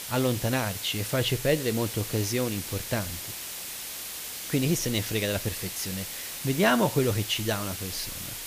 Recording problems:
hiss; loud; throughout; 6 dB below the speech

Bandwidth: 15 kHz